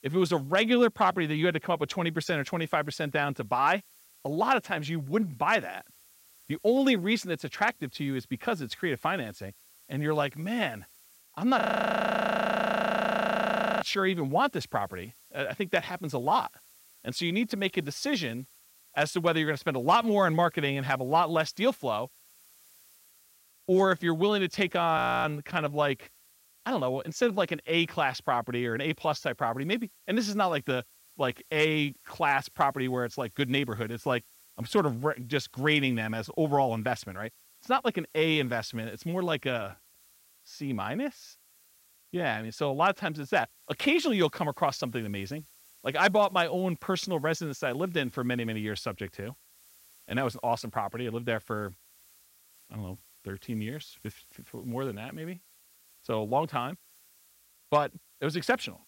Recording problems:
hiss; faint; throughout; 25 dB below the speech
audio freezing; at 12 s for 2 s and at 25 s

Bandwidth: 16 kHz